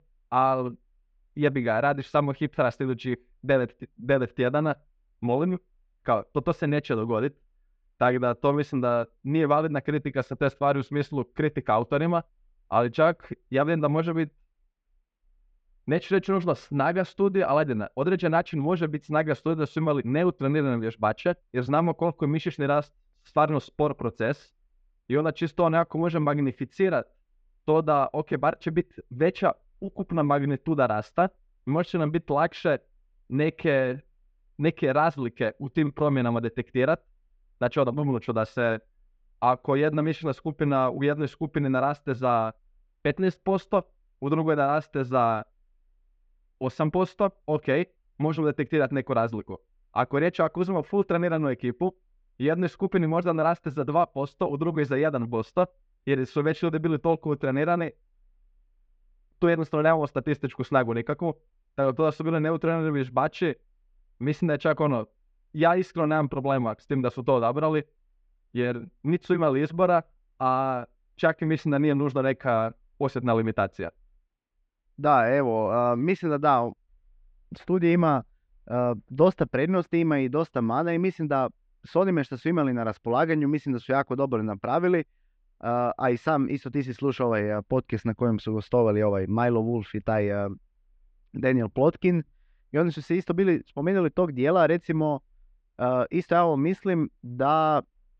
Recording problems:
muffled; very; fading above 3 kHz

